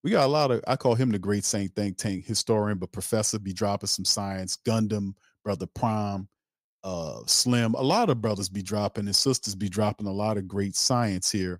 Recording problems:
none

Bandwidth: 15.5 kHz